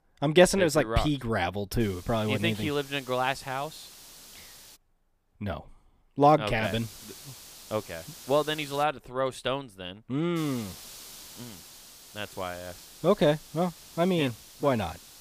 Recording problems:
hiss; noticeable; from 2 to 5 s, from 6.5 to 9 s and from 10 s on; 20 dB below the speech

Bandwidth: 15 kHz